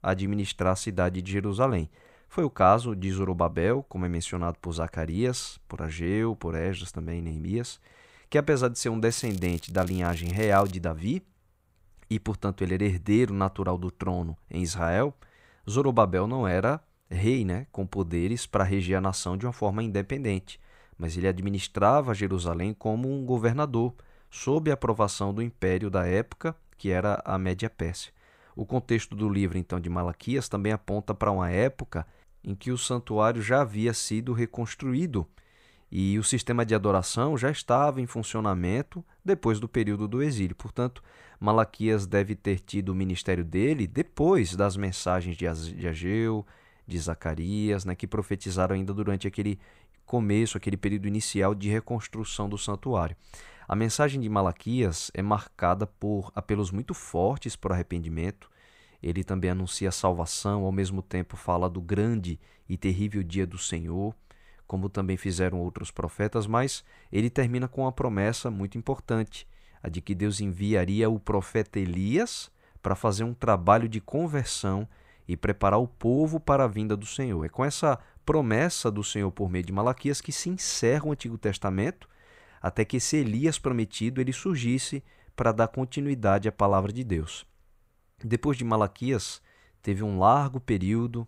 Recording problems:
crackling; noticeable; from 9 to 11 s; 20 dB below the speech

